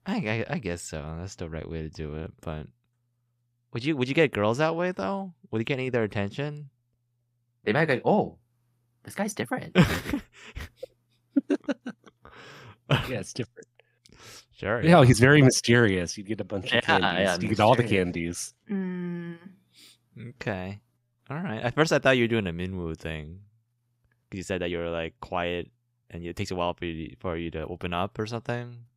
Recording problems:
uneven, jittery; strongly; from 2 to 28 s

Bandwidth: 15.5 kHz